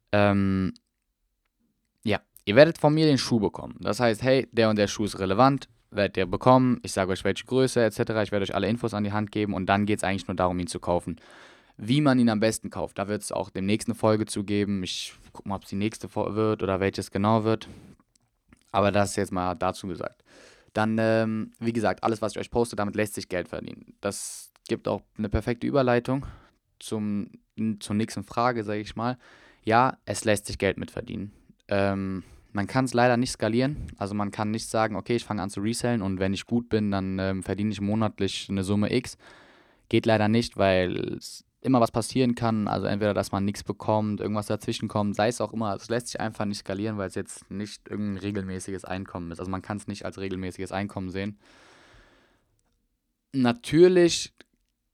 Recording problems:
uneven, jittery; strongly; from 13 to 49 s

